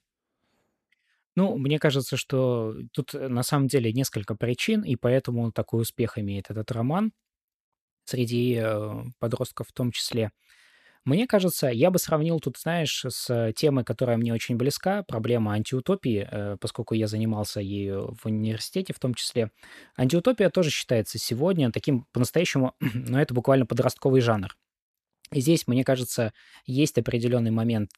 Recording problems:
none

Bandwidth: 13.5 kHz